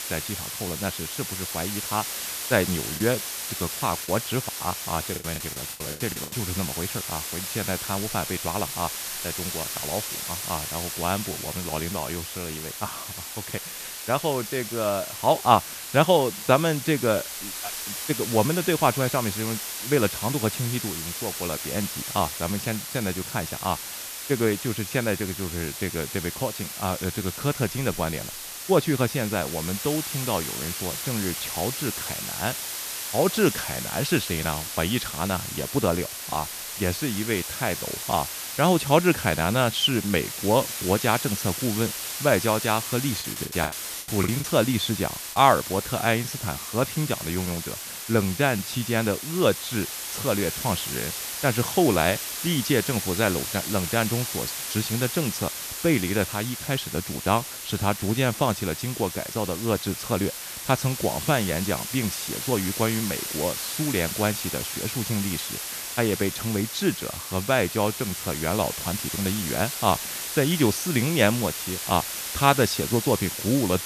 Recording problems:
hiss; loud; throughout; 4 dB below the speech
choppy; very; from 3 to 6.5 s and from 43 to 45 s; 17% of the speech affected

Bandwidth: 14.5 kHz